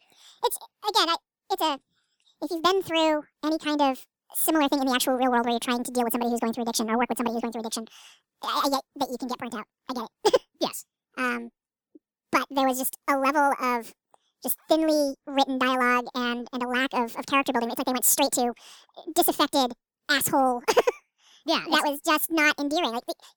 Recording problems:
wrong speed and pitch; too fast and too high; 1.7 times normal speed

